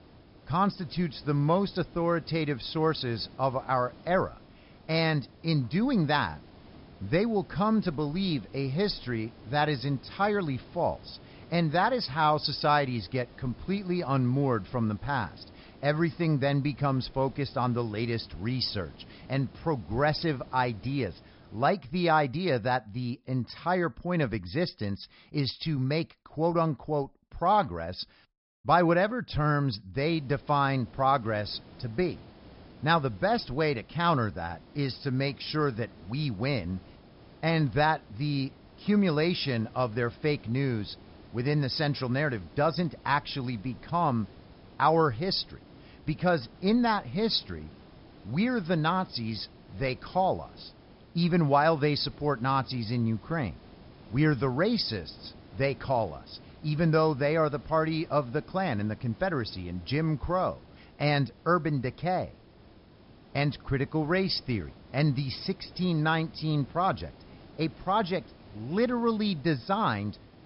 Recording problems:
high frequencies cut off; noticeable; nothing above 5.5 kHz
hiss; faint; until 22 s and from 30 s on; 25 dB below the speech

